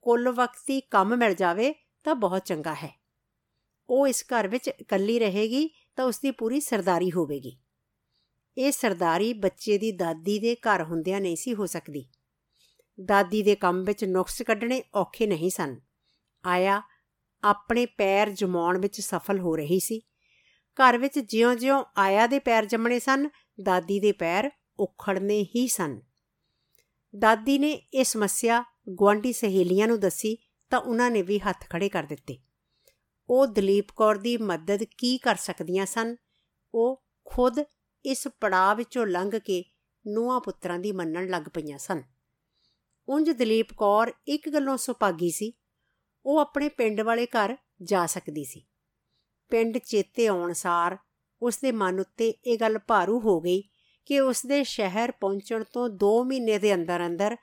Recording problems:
none

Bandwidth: 17.5 kHz